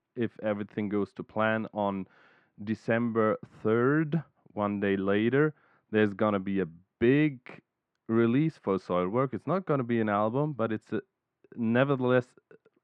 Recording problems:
muffled; very; fading above 1.5 kHz

